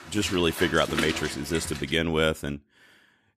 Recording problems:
rain or running water; loud; until 1.5 s; 8 dB below the speech

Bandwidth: 14.5 kHz